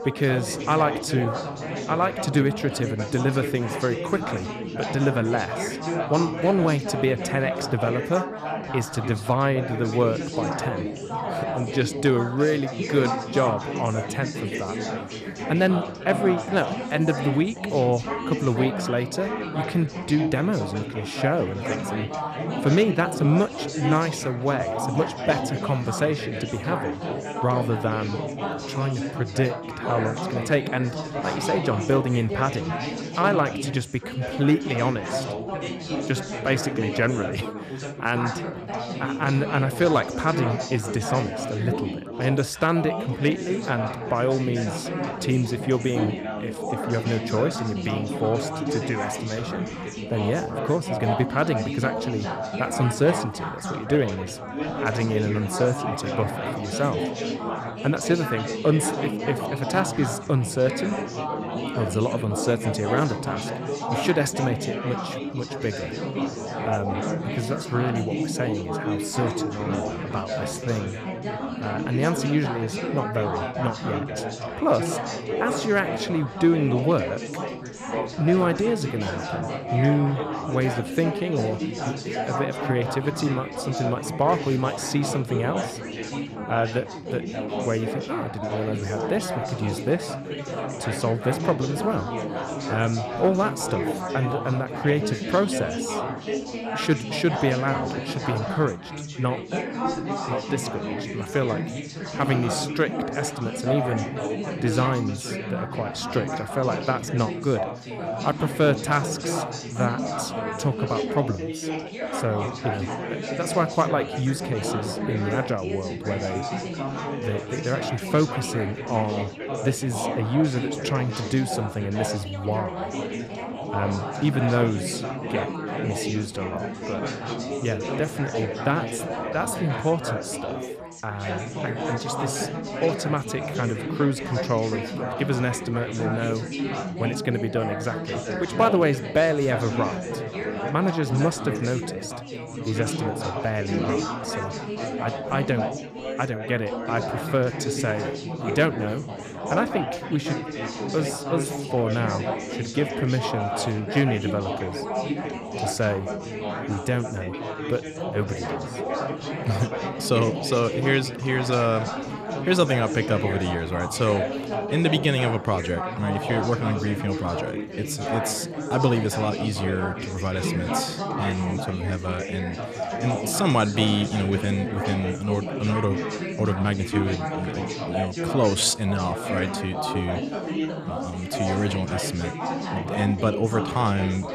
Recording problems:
chatter from many people; loud; throughout; 4 dB below the speech

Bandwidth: 14.5 kHz